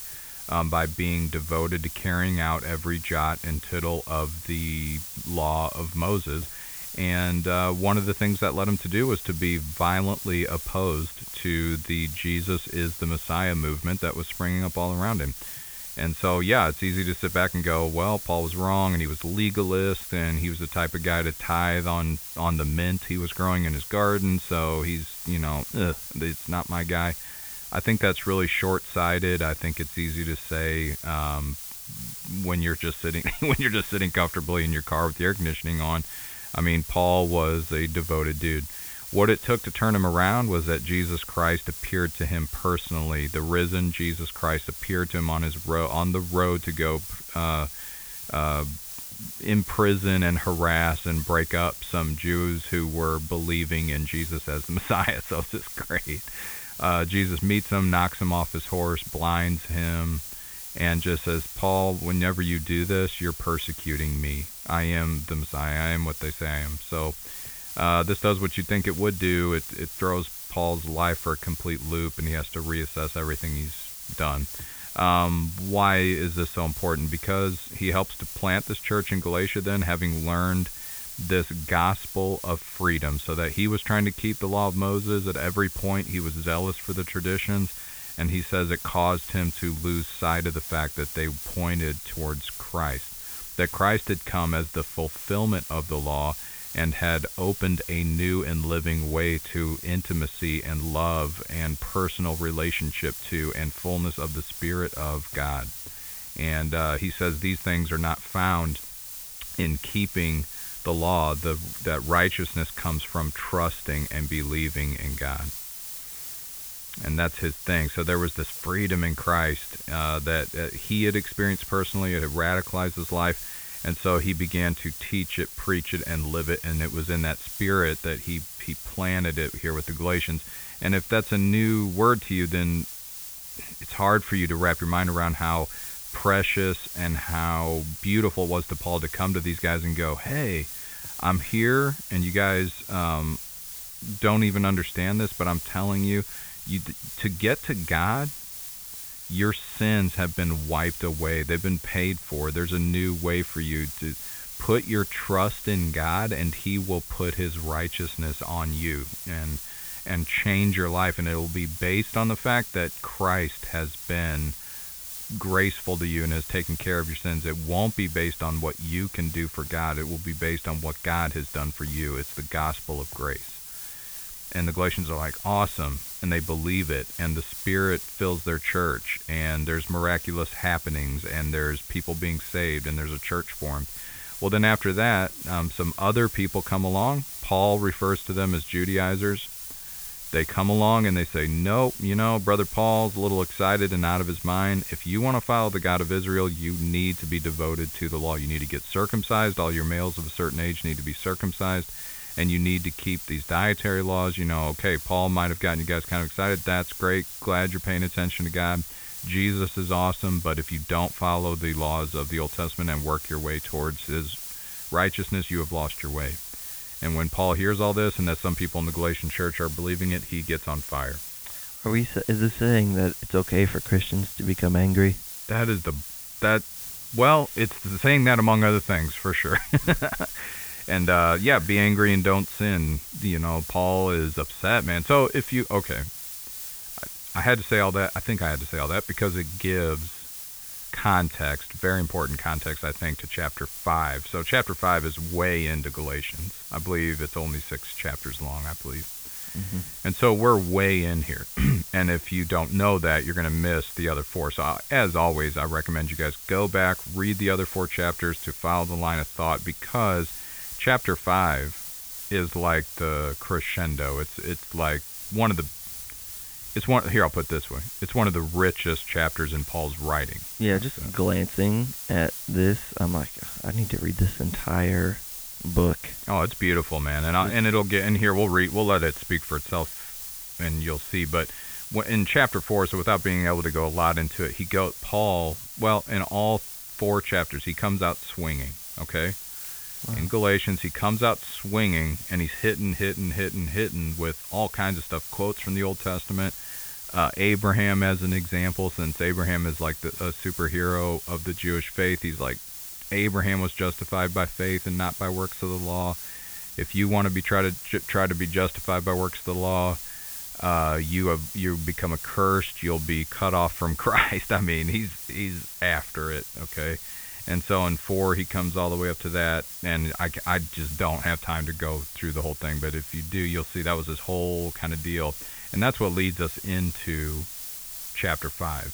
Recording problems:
high frequencies cut off; severe; nothing above 4 kHz
hiss; loud; throughout; 9 dB below the speech

